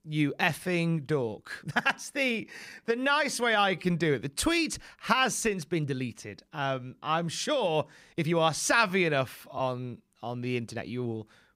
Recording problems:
uneven, jittery; strongly; from 0.5 to 11 s

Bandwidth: 15.5 kHz